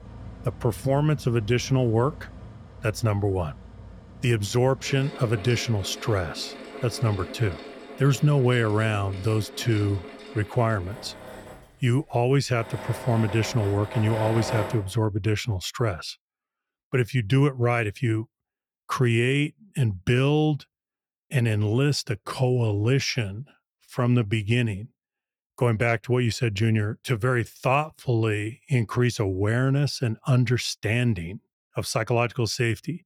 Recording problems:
machinery noise; noticeable; until 15 s; 15 dB below the speech

